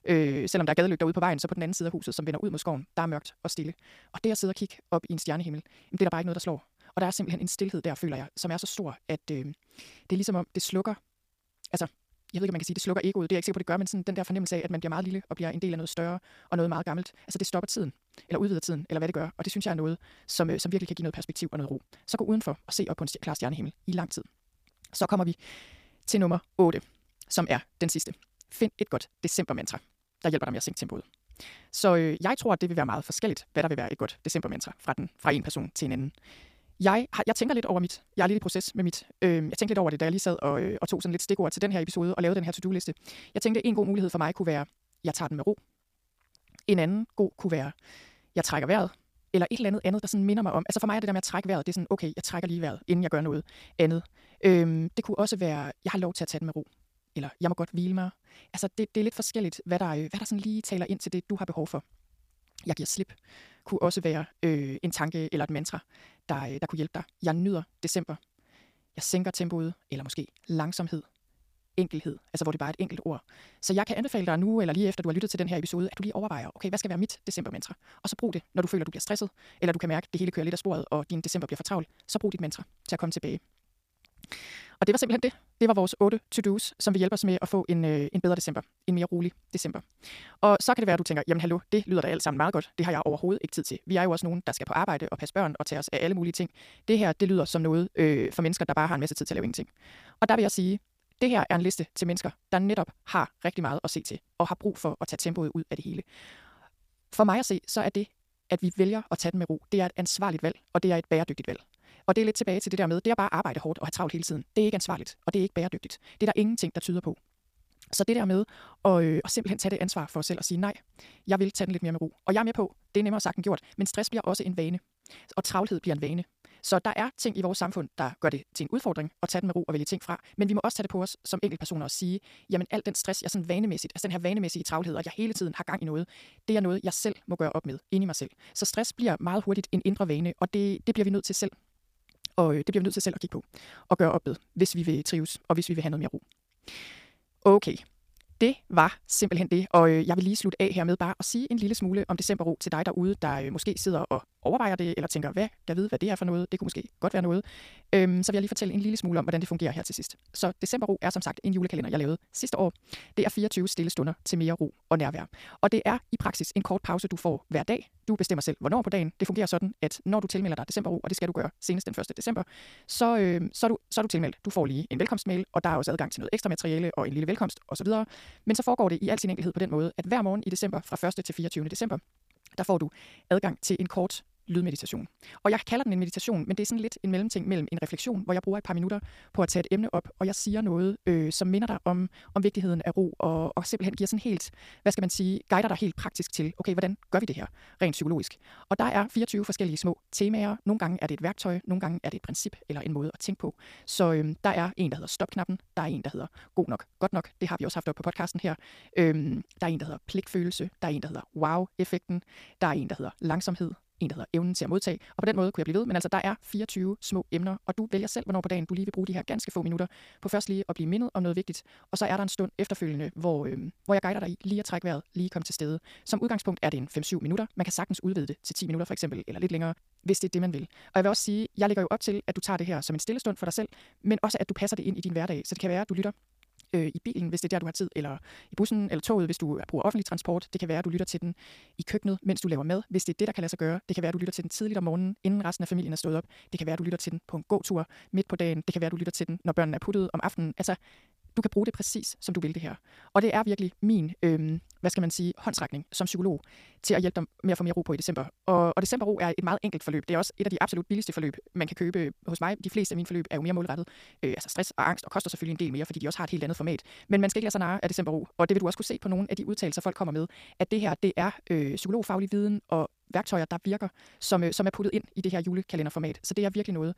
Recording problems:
wrong speed, natural pitch; too fast; 1.8 times normal speed

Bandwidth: 15 kHz